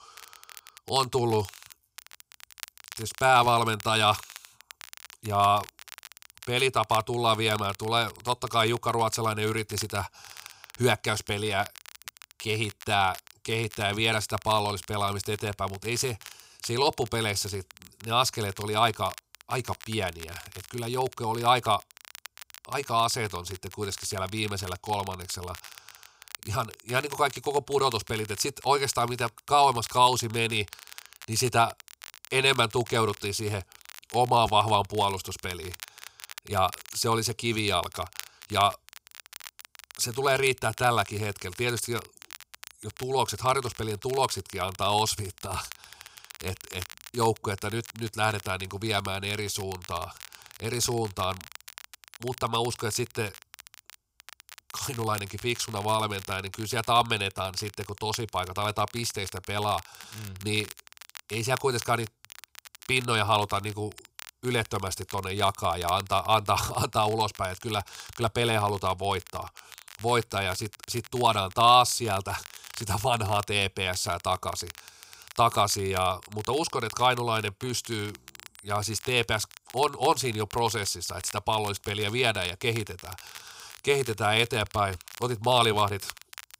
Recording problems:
crackle, like an old record; noticeable; 20 dB below the speech

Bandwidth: 15.5 kHz